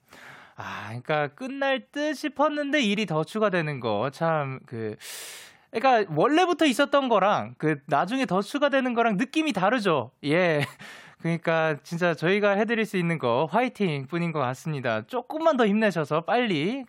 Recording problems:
none

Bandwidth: 16 kHz